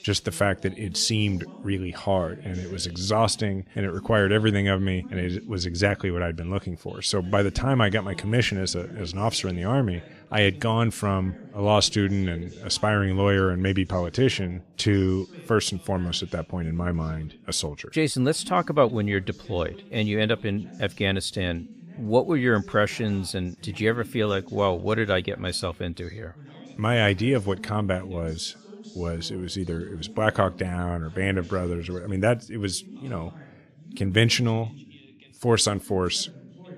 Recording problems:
background chatter; faint; throughout; 2 voices, 20 dB below the speech

